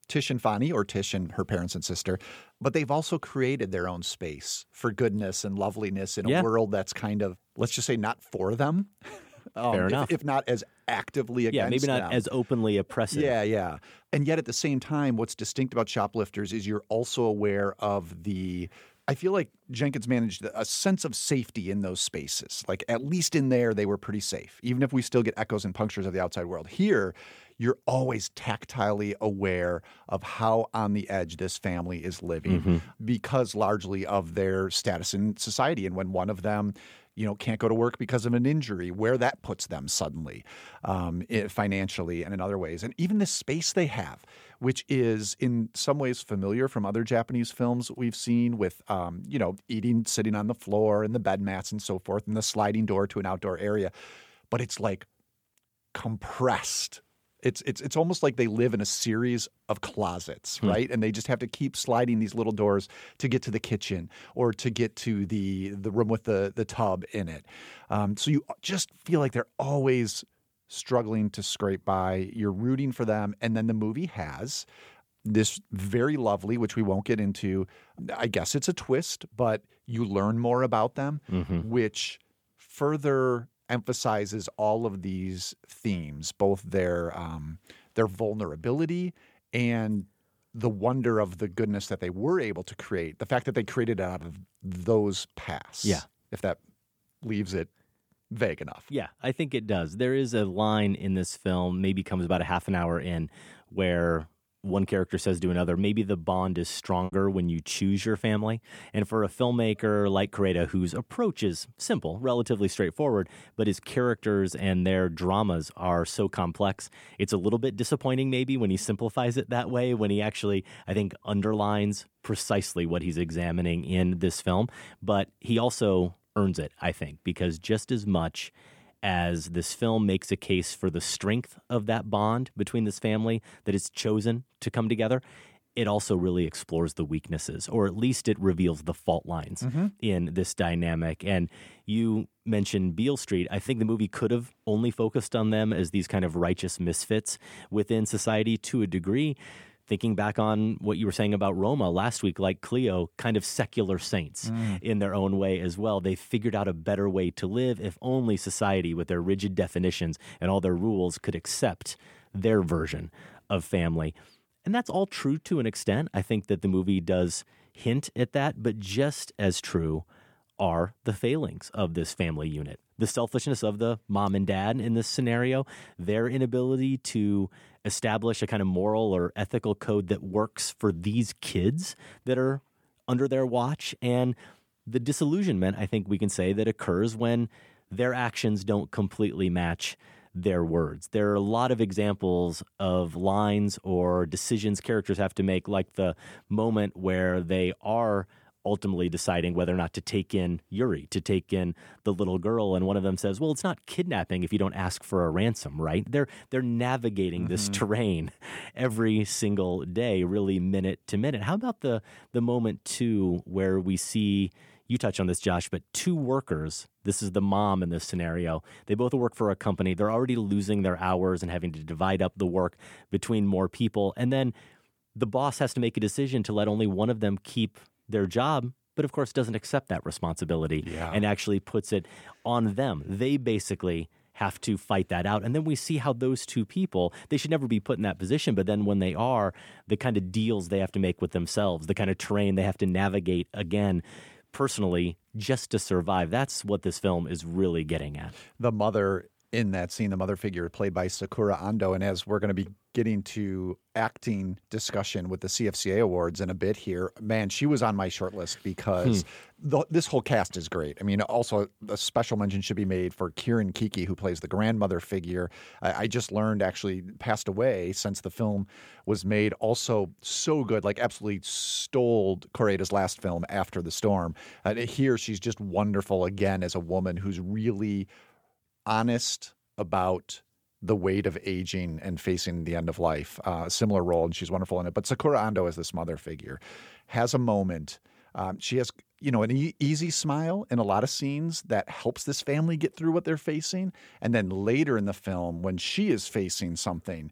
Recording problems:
choppy; very; at 1:47; 8% of the speech affected

